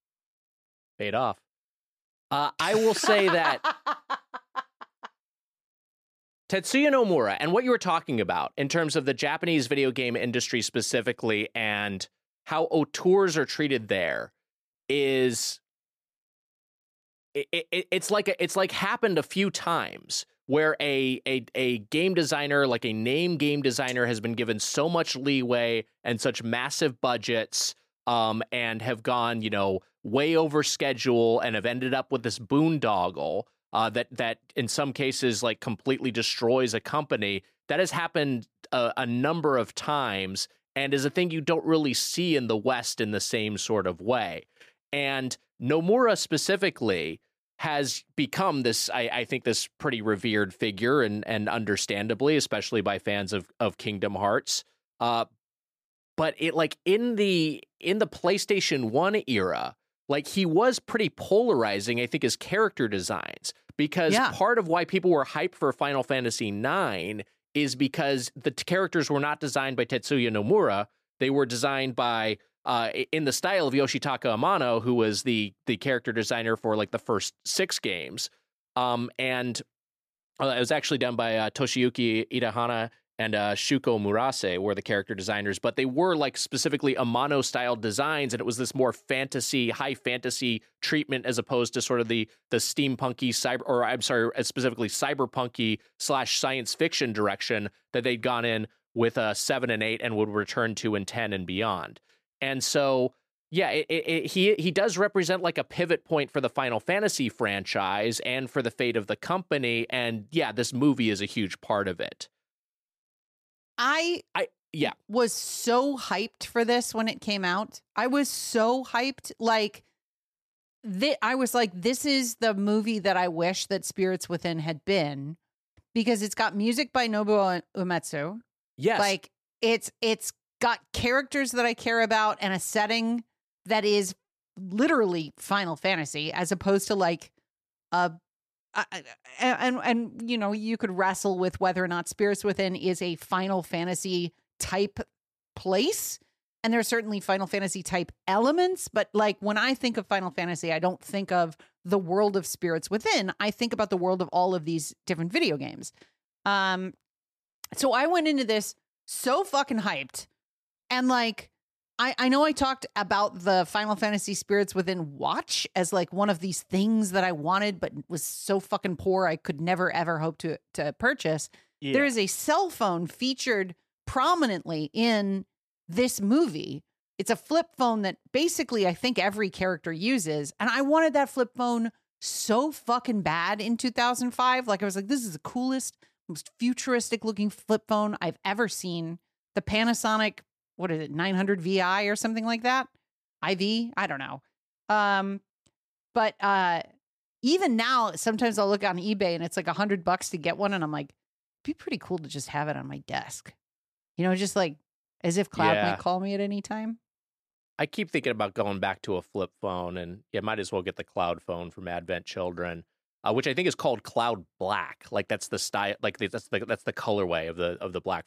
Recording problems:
none

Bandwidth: 14.5 kHz